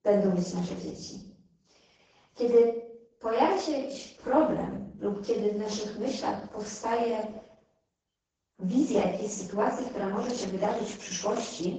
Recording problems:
off-mic speech; far
garbled, watery; badly; nothing above 7 kHz
room echo; noticeable; dies away in 0.6 s

